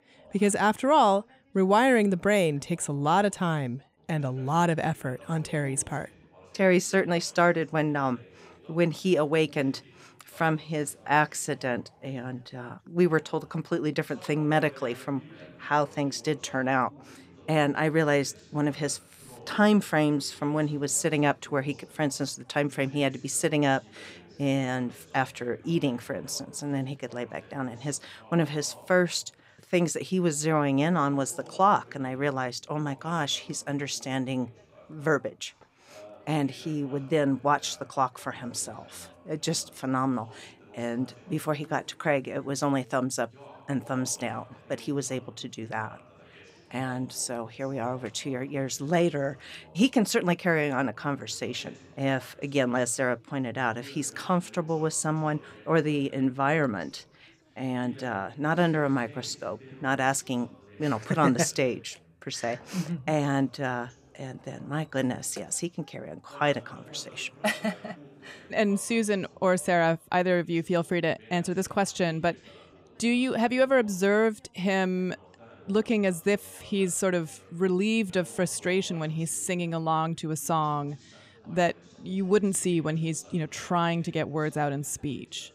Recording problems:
background chatter; faint; throughout; 2 voices, 25 dB below the speech

